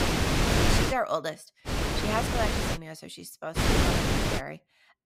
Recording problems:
wind noise on the microphone; heavy; at the start, from 1.5 to 3 s and at 3.5 s; 4 dB above the speech

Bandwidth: 15.5 kHz